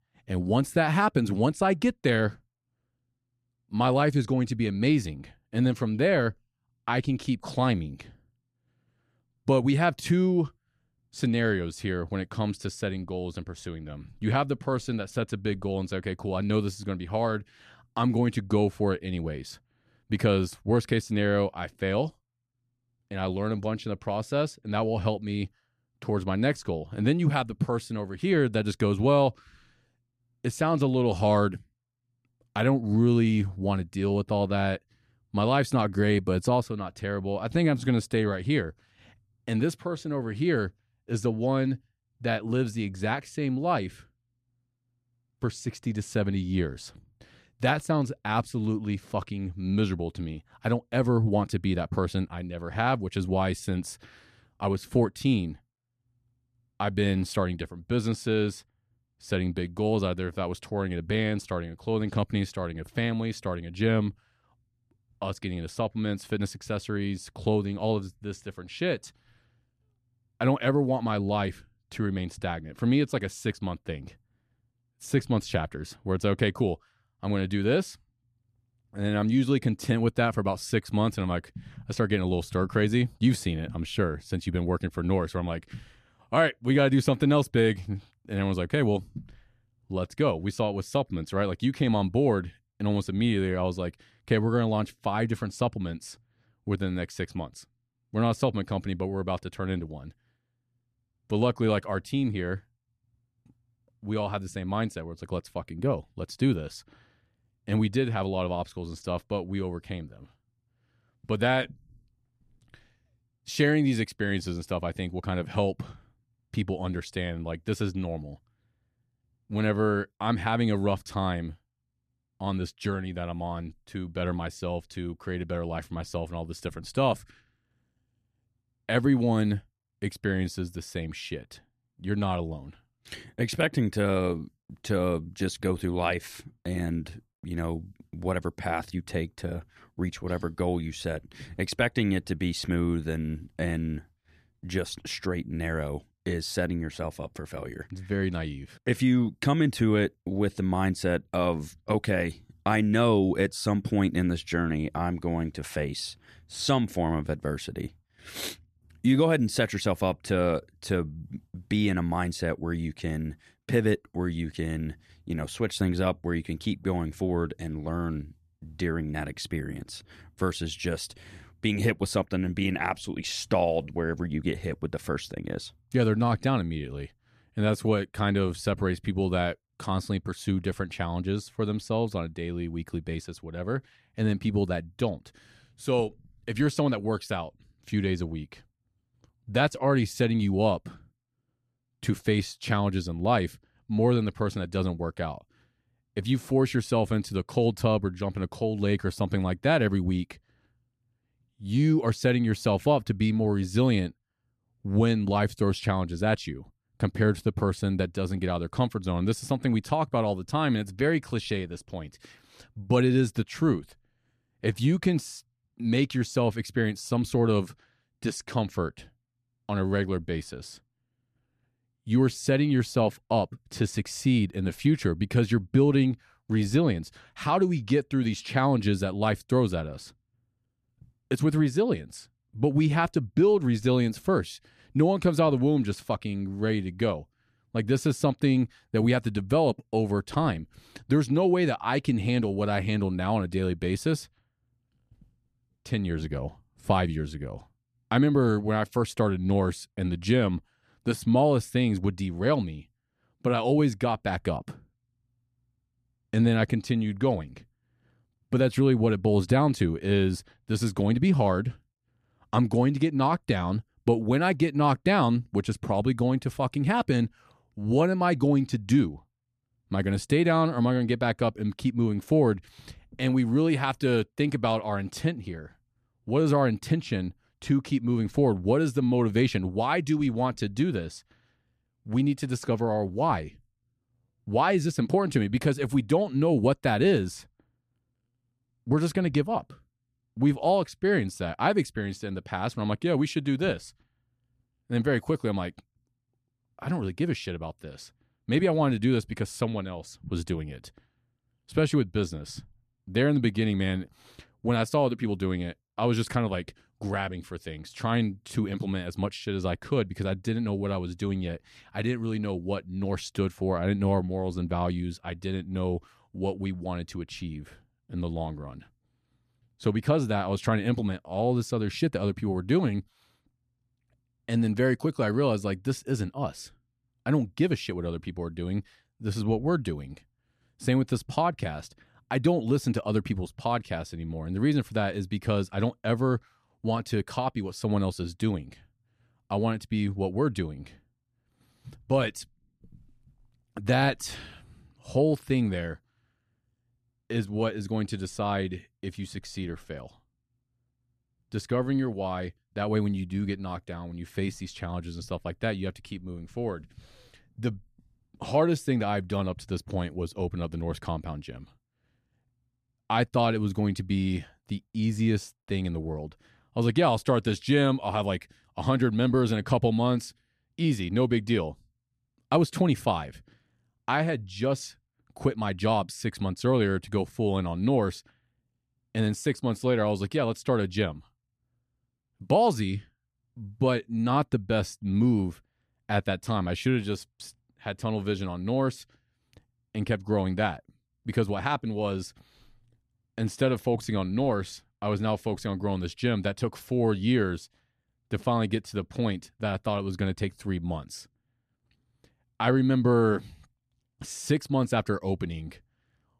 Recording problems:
none

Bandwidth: 14.5 kHz